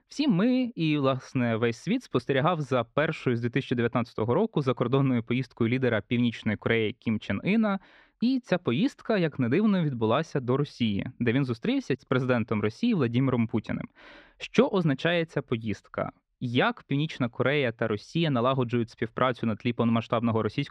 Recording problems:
muffled; slightly; fading above 3 kHz

